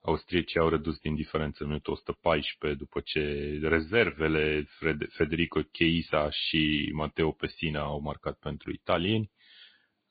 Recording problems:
high frequencies cut off; severe; nothing above 4.5 kHz
garbled, watery; slightly

